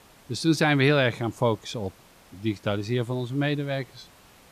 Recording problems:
hiss; faint; throughout; 25 dB below the speech

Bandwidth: 14.5 kHz